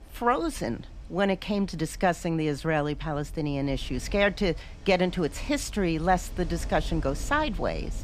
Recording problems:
rain or running water; noticeable; throughout; 15 dB below the speech

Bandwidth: 14.5 kHz